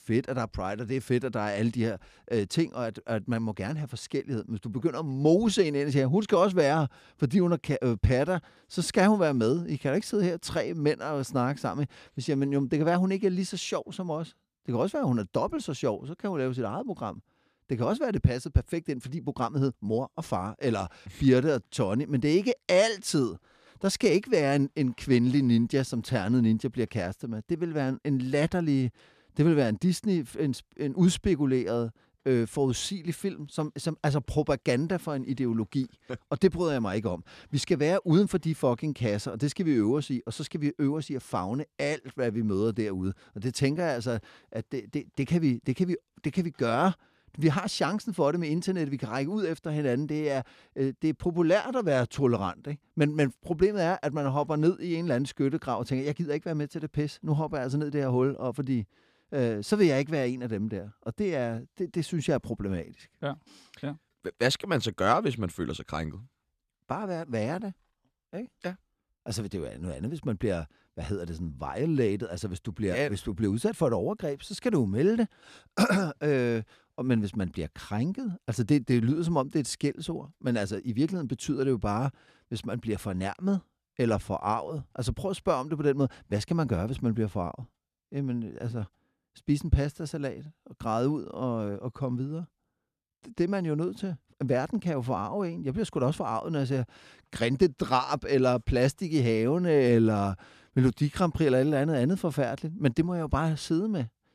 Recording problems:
none

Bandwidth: 14.5 kHz